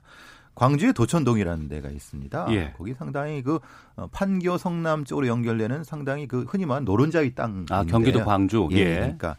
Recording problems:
none

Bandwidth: 15.5 kHz